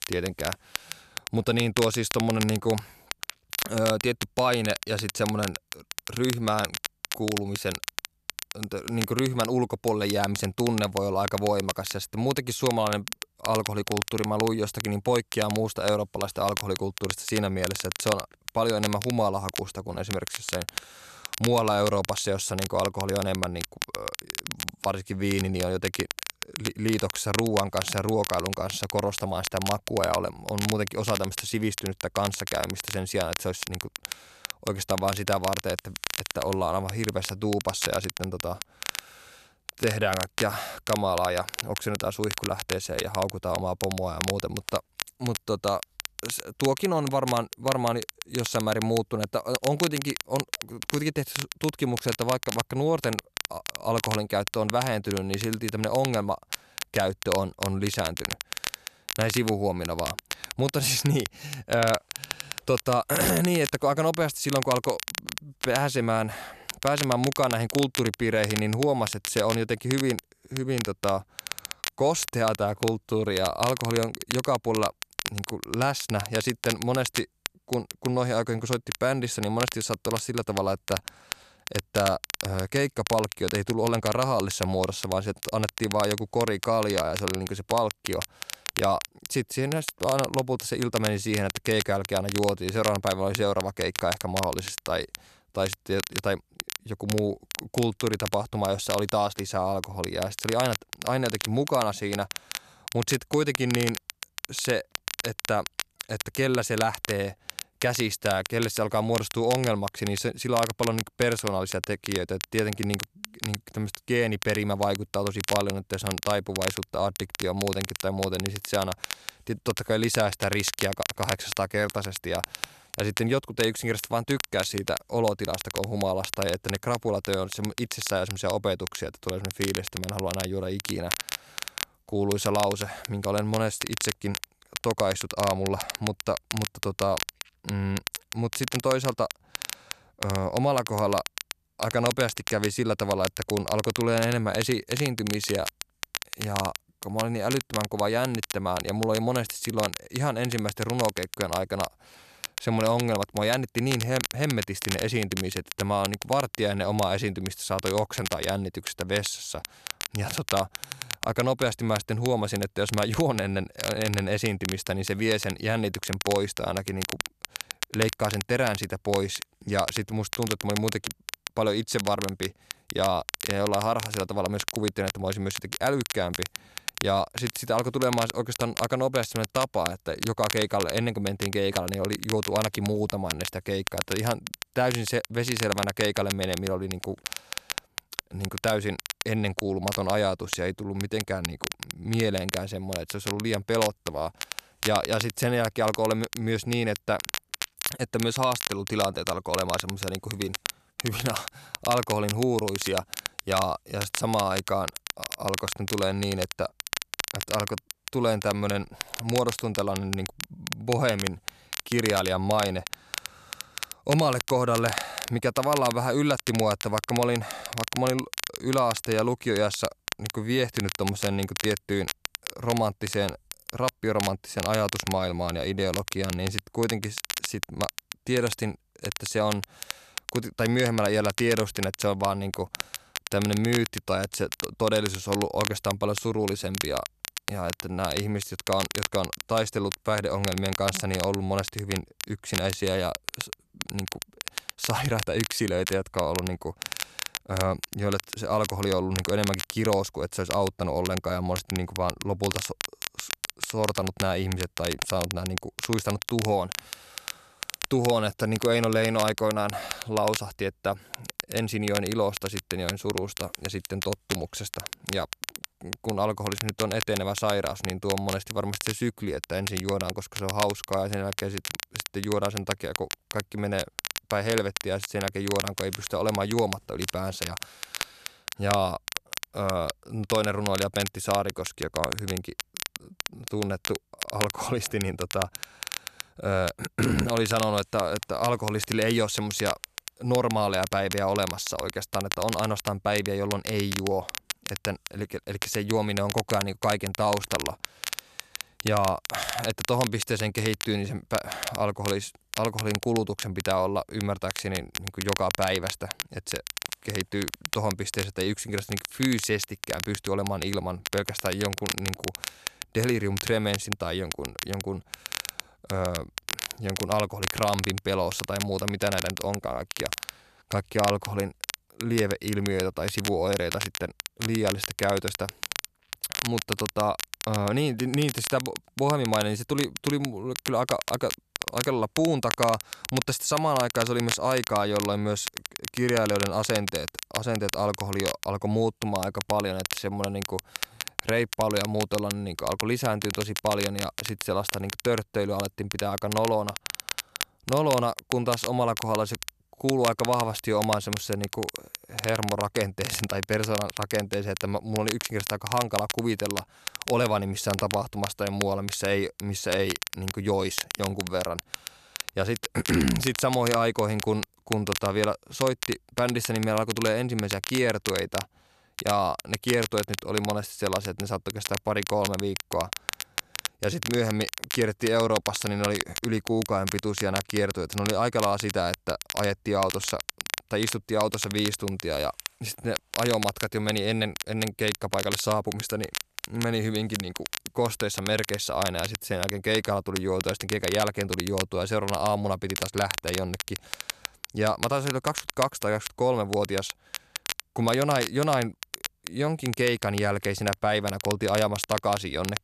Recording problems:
crackle, like an old record; loud; 6 dB below the speech

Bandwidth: 13.5 kHz